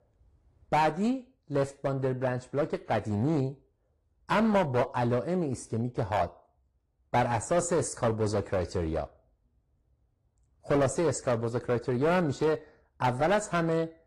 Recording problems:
distortion; slight; 6% of the sound clipped
garbled, watery; slightly

